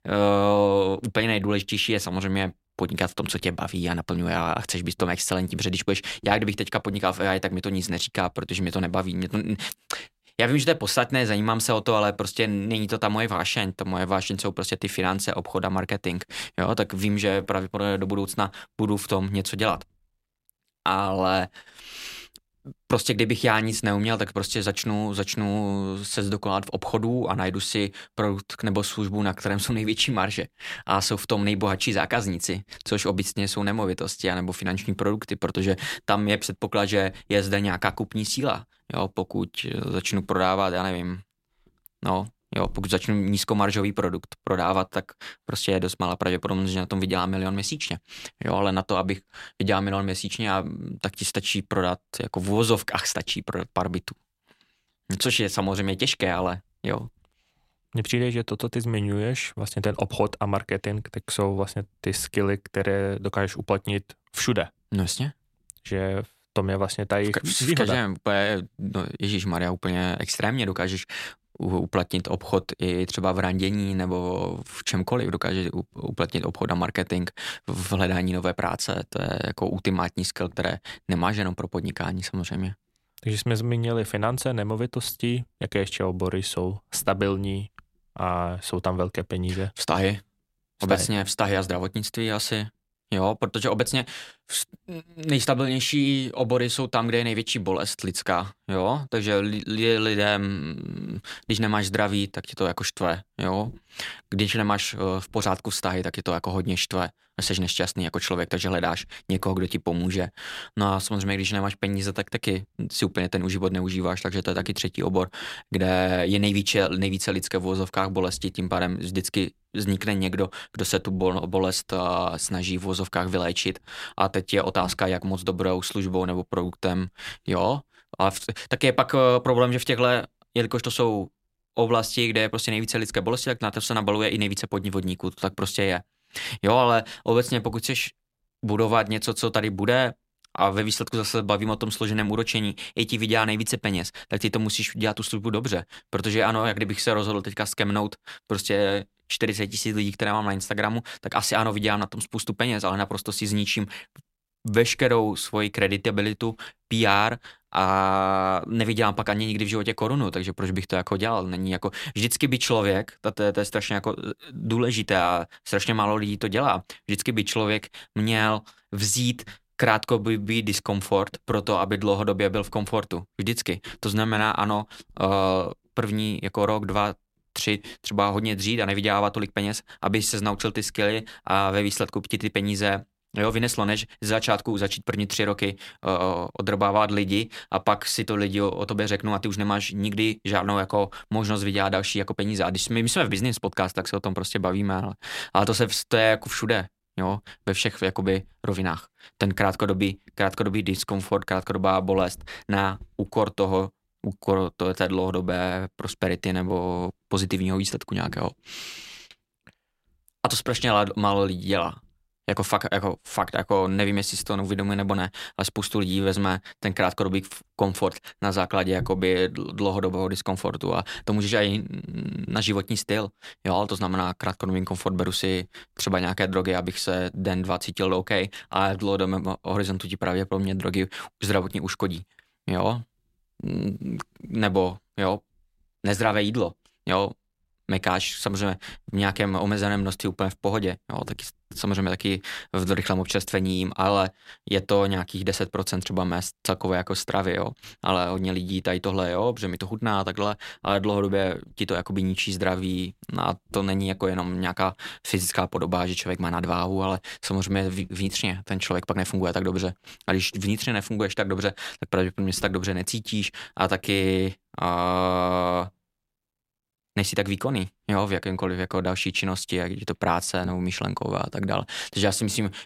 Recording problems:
none

